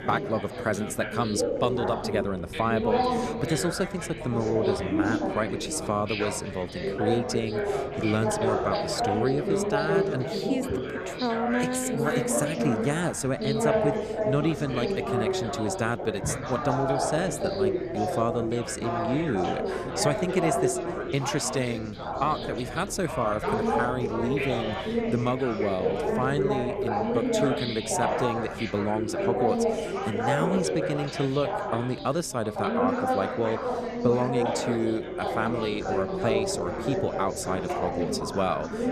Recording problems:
chatter from many people; very loud; throughout; as loud as the speech
wind noise on the microphone; occasional gusts; 25 dB below the speech

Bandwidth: 14 kHz